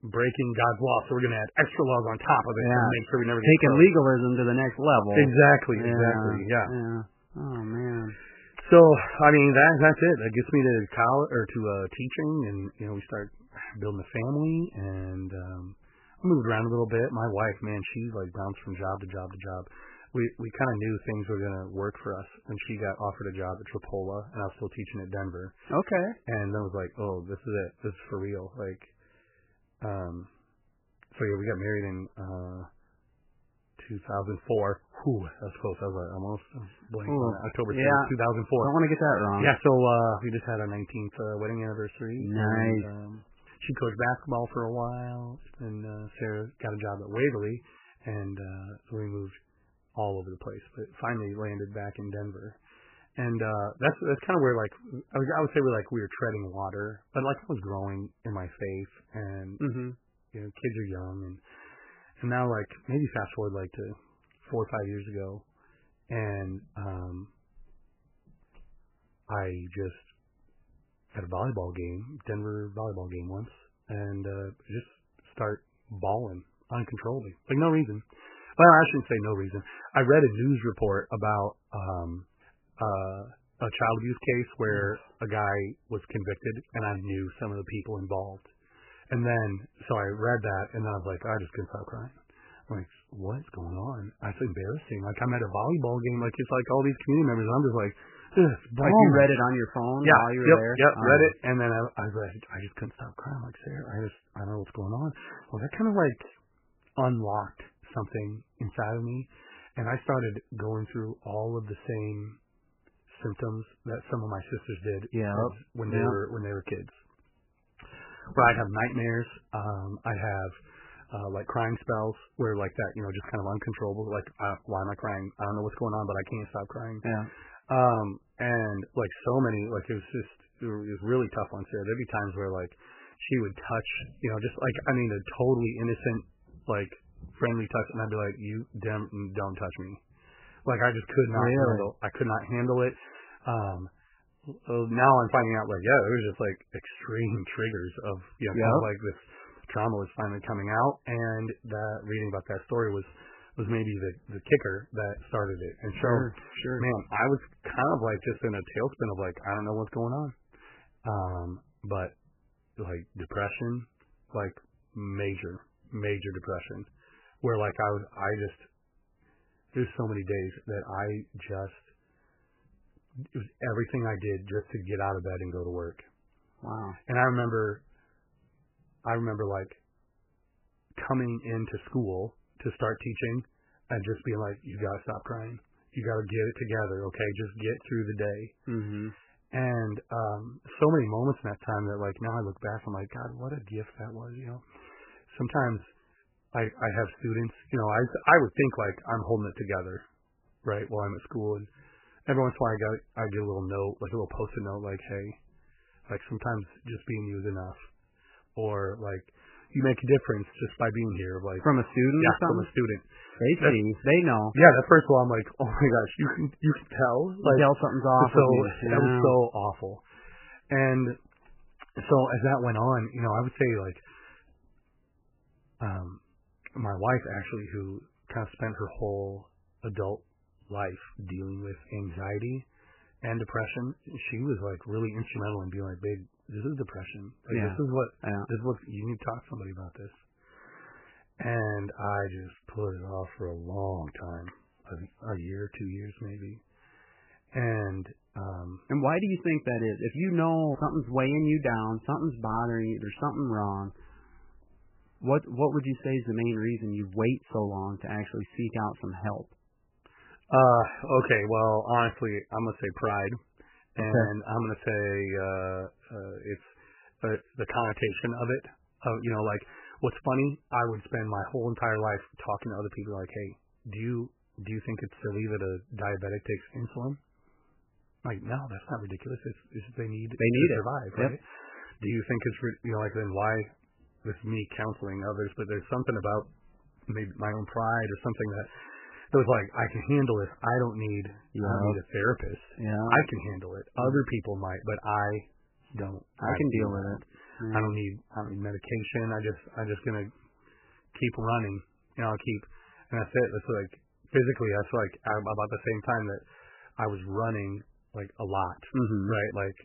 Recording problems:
garbled, watery; badly; nothing above 3 kHz

